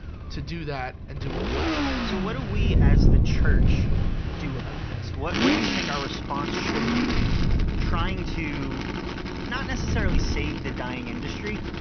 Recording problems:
high frequencies cut off; noticeable; nothing above 6 kHz
traffic noise; very loud; throughout; 3 dB above the speech
wind noise on the microphone; heavy; 3 dB below the speech
electrical hum; faint; throughout; 60 Hz, 20 dB below the speech
choppy; occasionally; at 7 s; 1% of the speech affected

